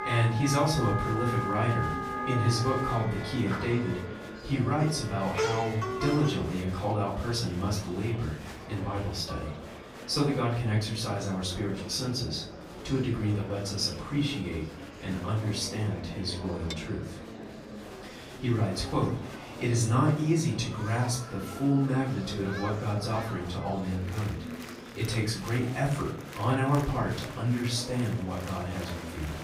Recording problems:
off-mic speech; far
room echo; slight; dies away in 0.5 s
background music; loud; until 6 s; 5 dB below the speech
murmuring crowd; noticeable; throughout; 10 dB below the speech
clattering dishes; faint; at 9.5 s and at 17 s; peak 10 dB below the speech

